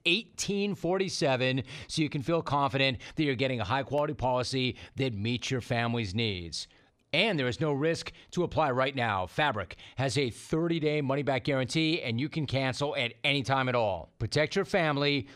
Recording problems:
none

